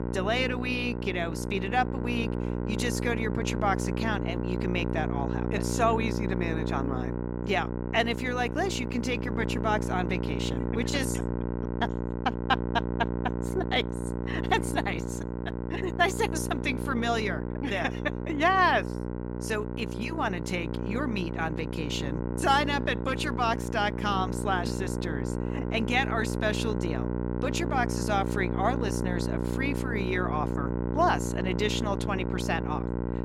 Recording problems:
electrical hum; loud; throughout; 60 Hz, 7 dB below the speech

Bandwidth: 16 kHz